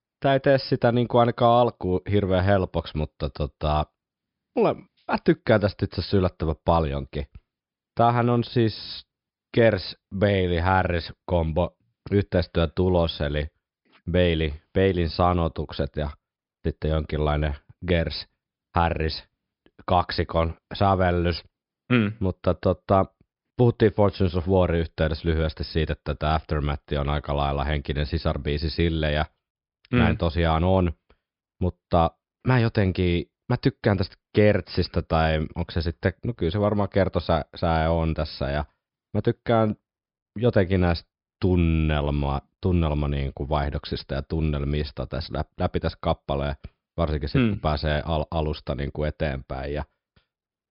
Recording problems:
high frequencies cut off; noticeable; nothing above 5.5 kHz

